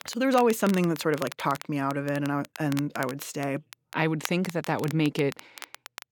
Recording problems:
crackle, like an old record; noticeable; 15 dB below the speech

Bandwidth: 17.5 kHz